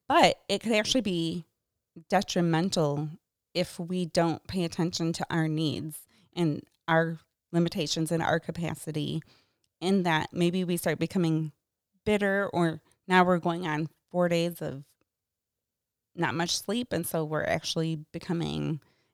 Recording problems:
none

